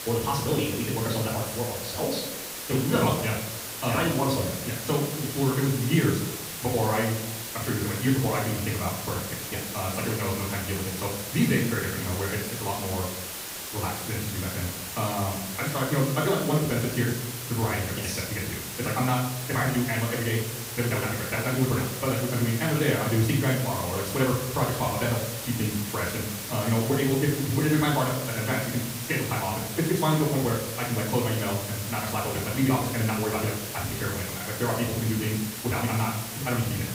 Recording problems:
off-mic speech; far
wrong speed, natural pitch; too fast; 1.7 times normal speed
room echo; noticeable; dies away in 0.7 s
hiss; loud; throughout; 6 dB below the speech

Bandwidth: 15.5 kHz